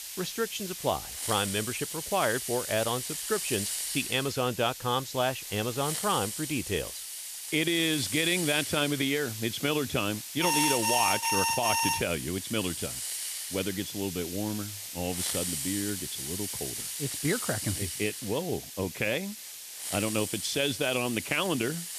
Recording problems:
hiss; loud; throughout; 4 dB below the speech
alarm; loud; from 10 to 12 s; peak 4 dB above the speech

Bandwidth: 14.5 kHz